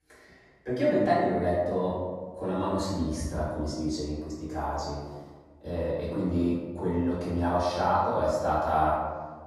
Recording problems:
room echo; strong; dies away in 1.2 s
off-mic speech; far

